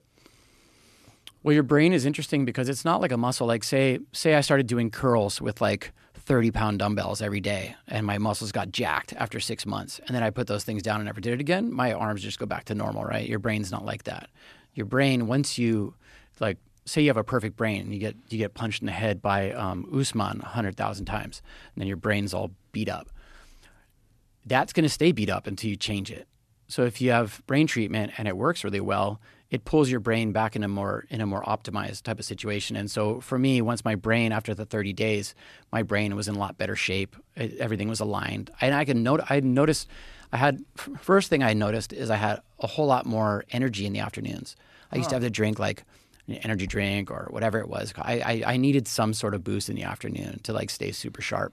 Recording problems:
none

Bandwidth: 13.5 kHz